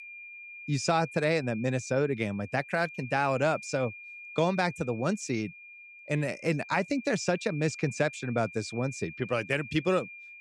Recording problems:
high-pitched whine; noticeable; throughout; 2.5 kHz, 15 dB below the speech

